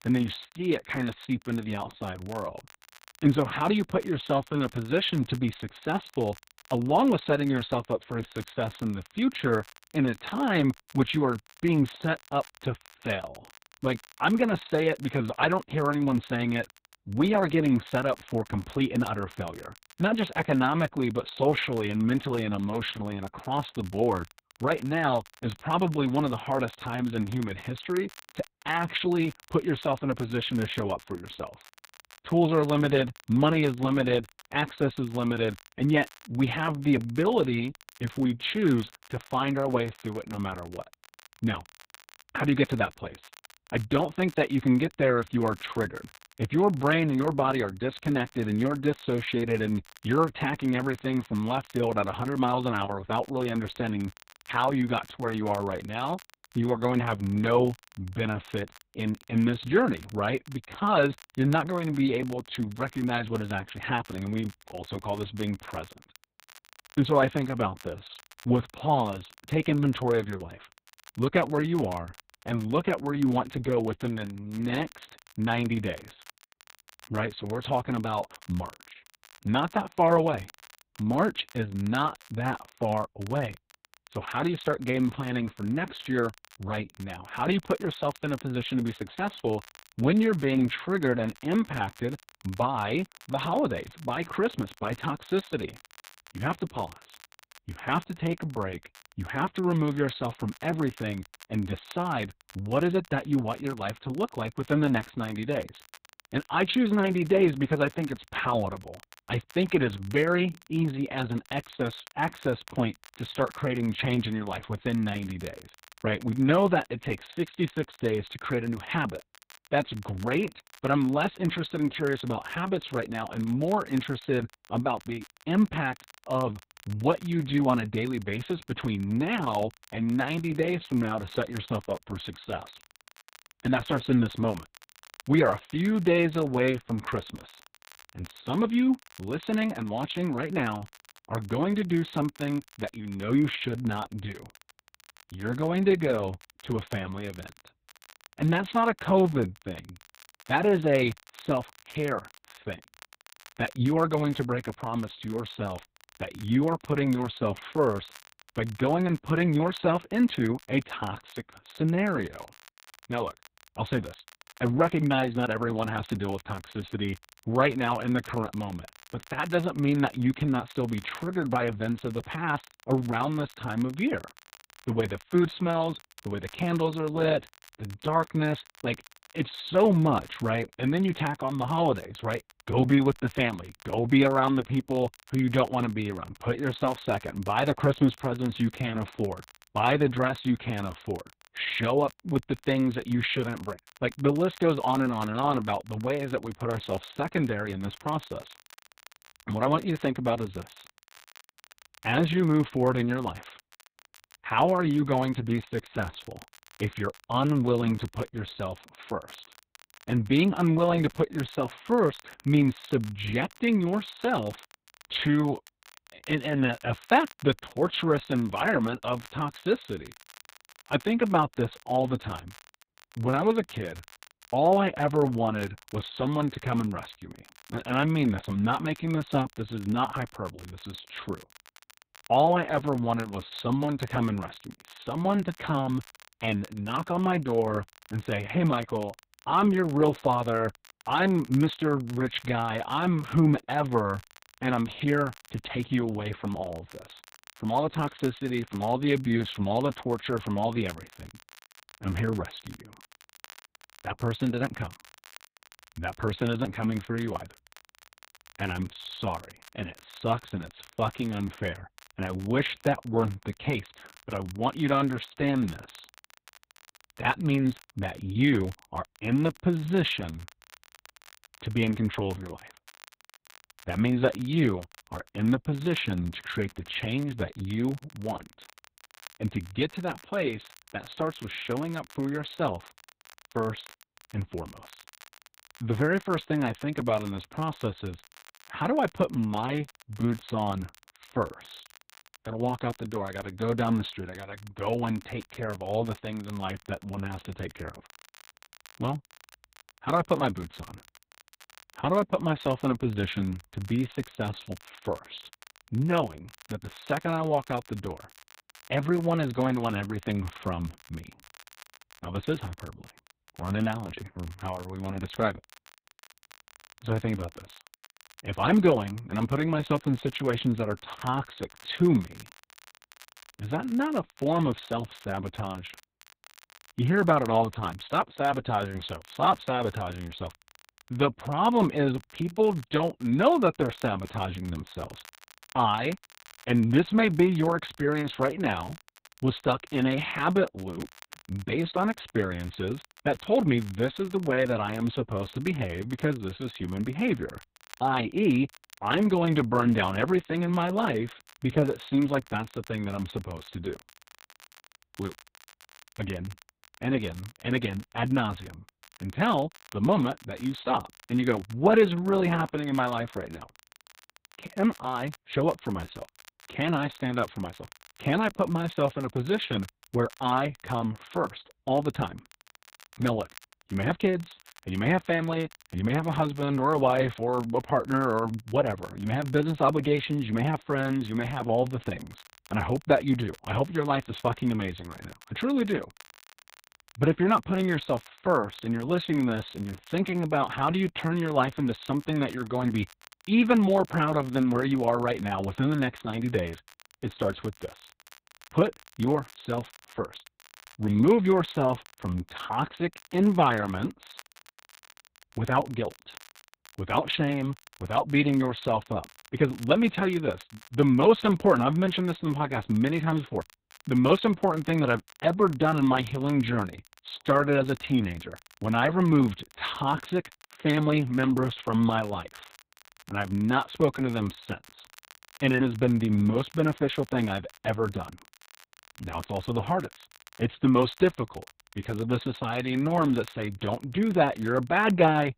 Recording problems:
garbled, watery; badly; nothing above 4 kHz
crackle, like an old record; faint; 25 dB below the speech

